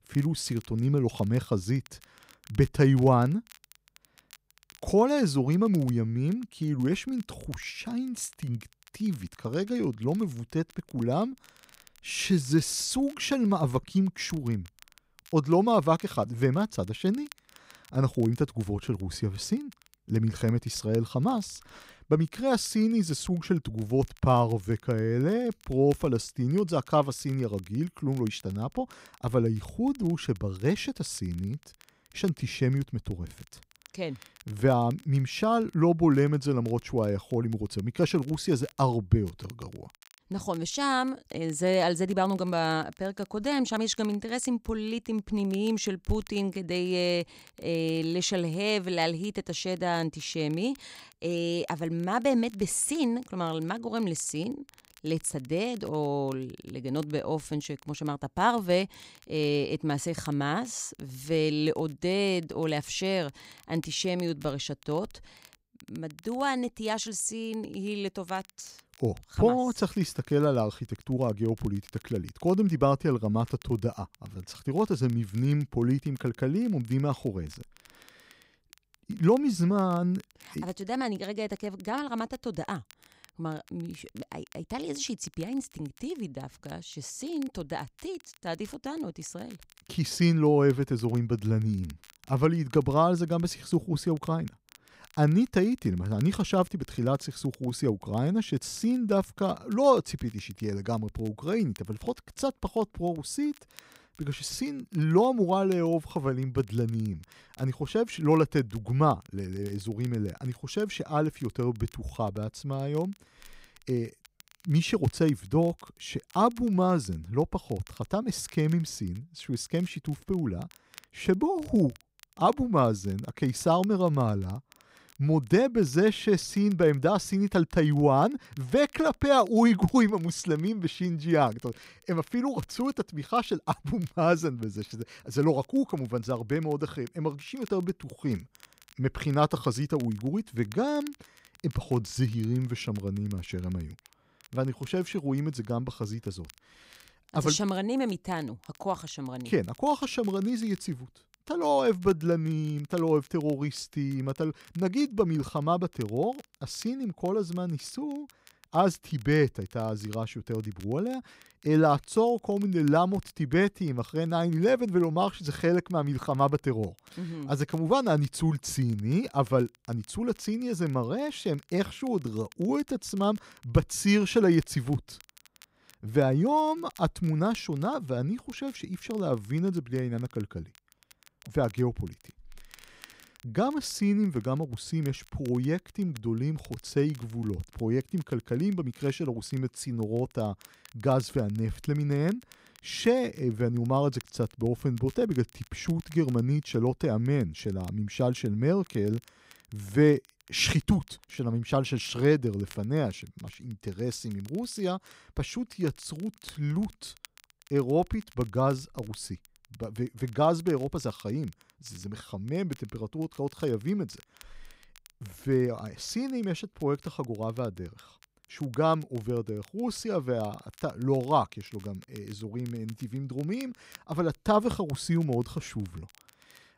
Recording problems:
crackle, like an old record; faint; 25 dB below the speech

